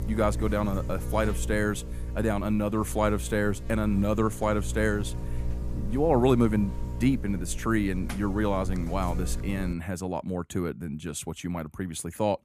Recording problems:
electrical hum; noticeable; until 9.5 s; 60 Hz, 15 dB below the speech

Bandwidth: 15 kHz